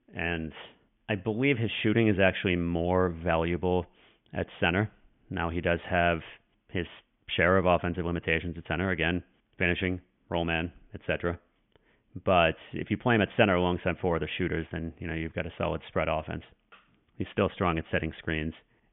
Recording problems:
high frequencies cut off; severe; nothing above 3.5 kHz

